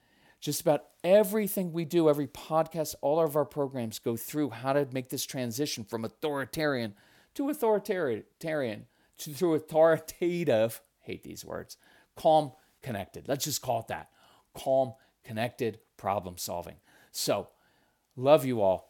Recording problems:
none

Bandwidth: 17 kHz